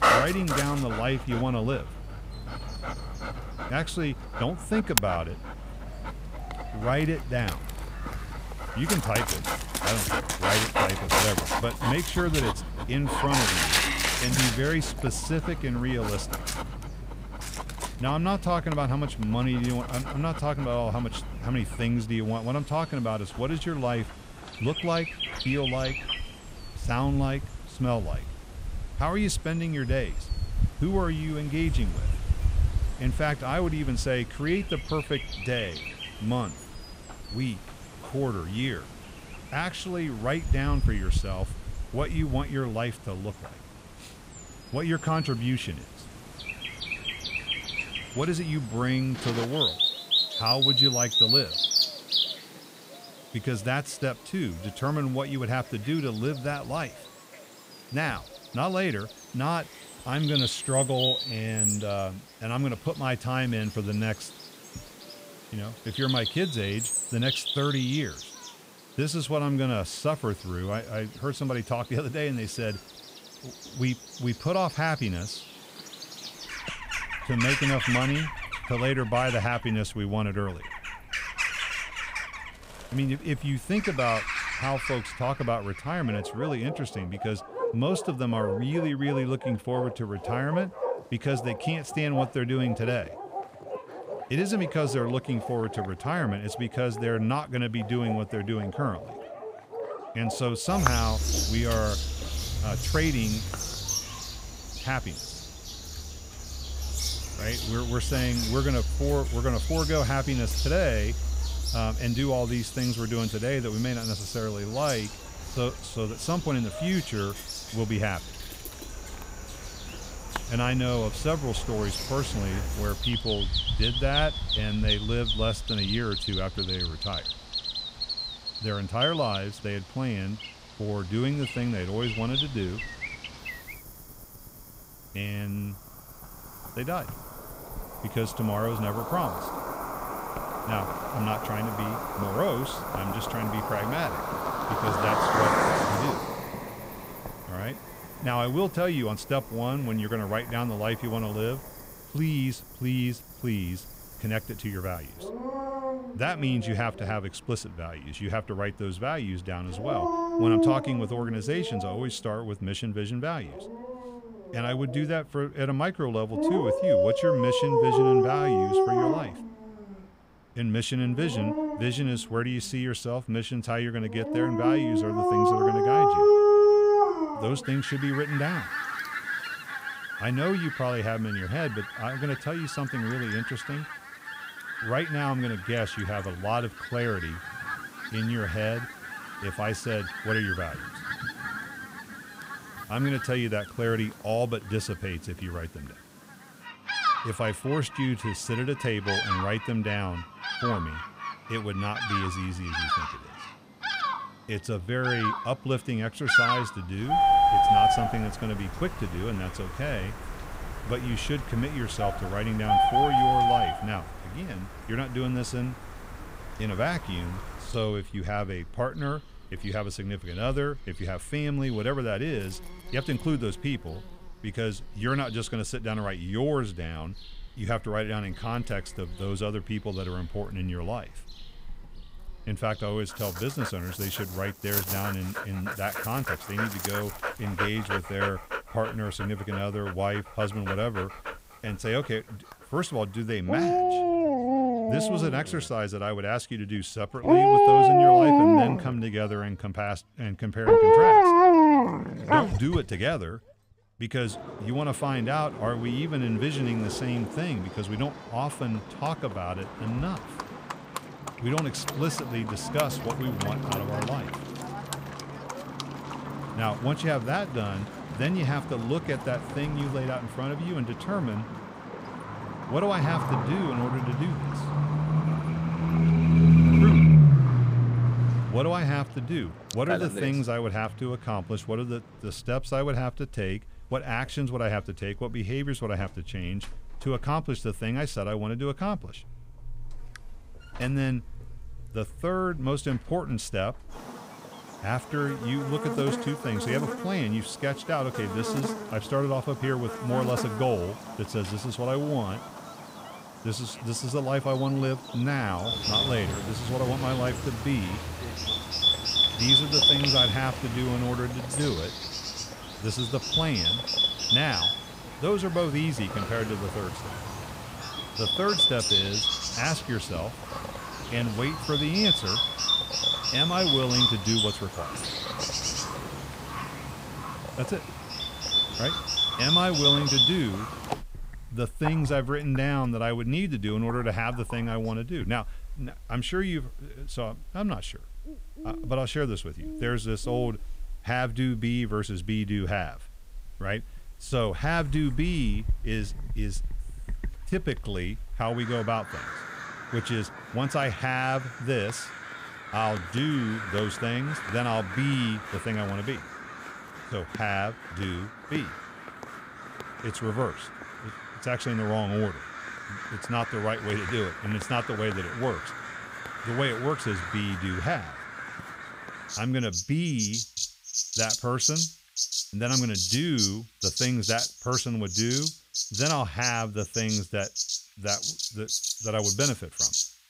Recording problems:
animal sounds; very loud; throughout; 2 dB above the speech

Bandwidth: 15.5 kHz